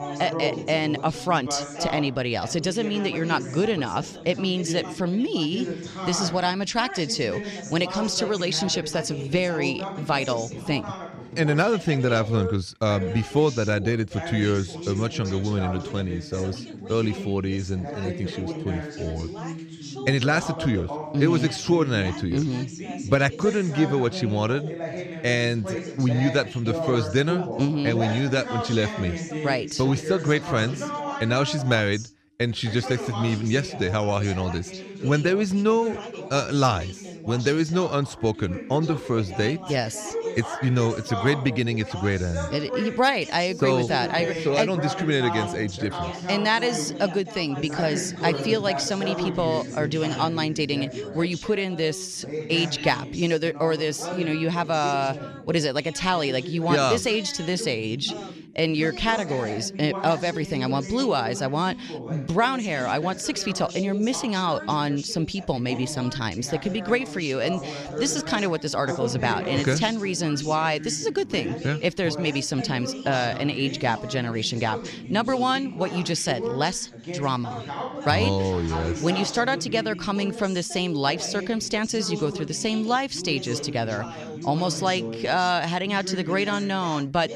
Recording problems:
background chatter; loud; throughout; 2 voices, 9 dB below the speech

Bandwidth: 14.5 kHz